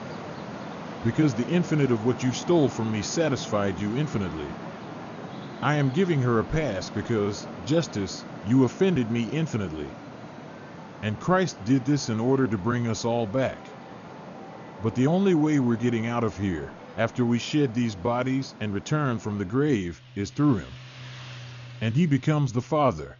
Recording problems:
high frequencies cut off; noticeable; nothing above 7 kHz
traffic noise; noticeable; throughout; 15 dB below the speech

